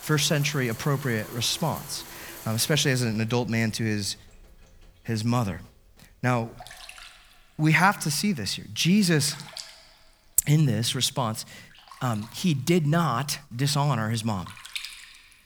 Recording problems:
household noises; noticeable; throughout; 15 dB below the speech

